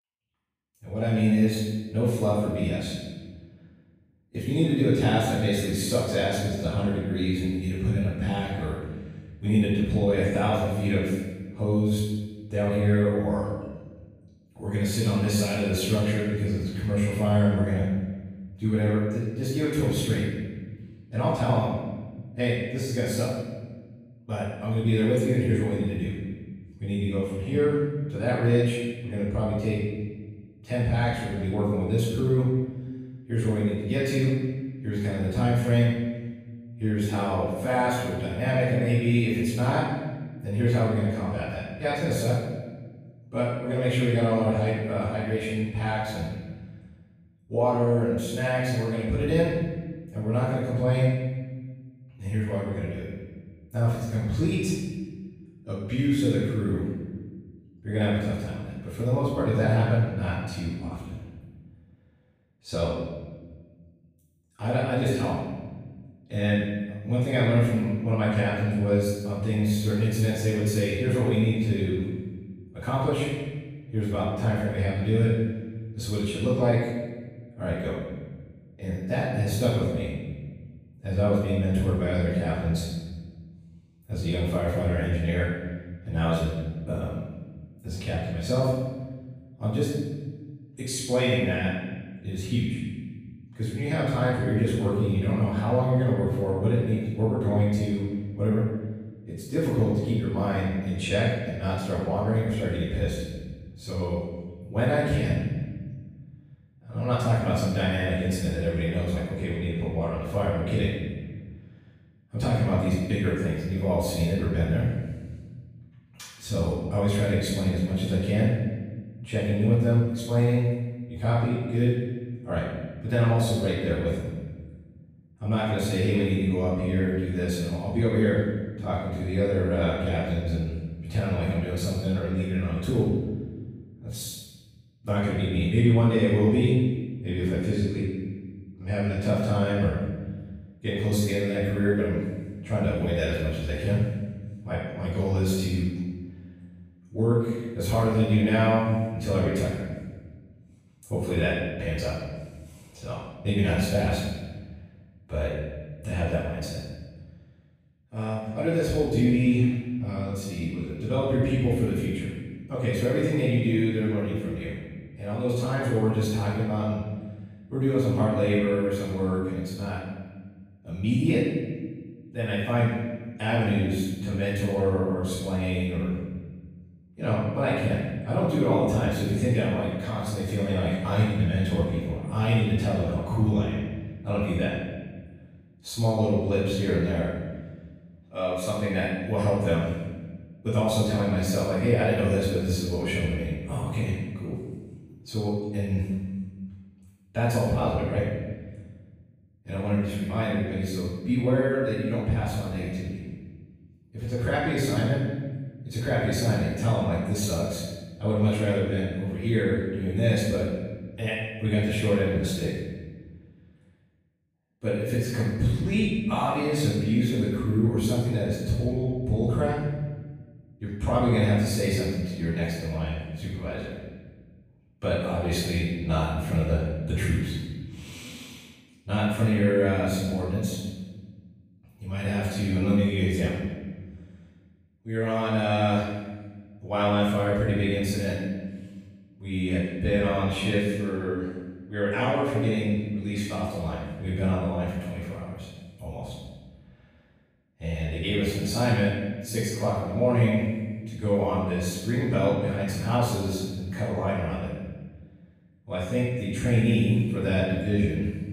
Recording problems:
room echo; strong; dies away in 1.4 s
off-mic speech; far

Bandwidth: 15 kHz